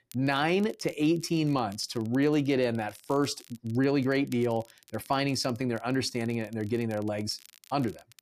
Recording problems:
crackle, like an old record; faint; 25 dB below the speech

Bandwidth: 14.5 kHz